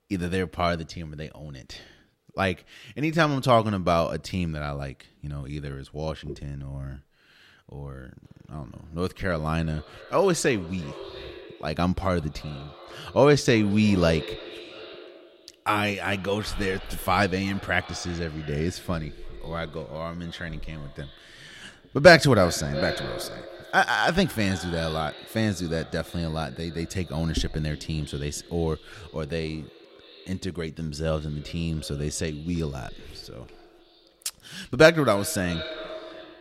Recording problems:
echo of what is said; noticeable; from 8 s on; 330 ms later, 15 dB below the speech

